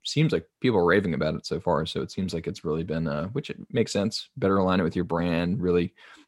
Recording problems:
none

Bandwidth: 16 kHz